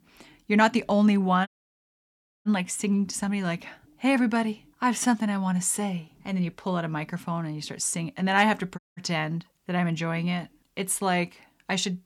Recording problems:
audio cutting out; at 1.5 s for 1 s and at 9 s

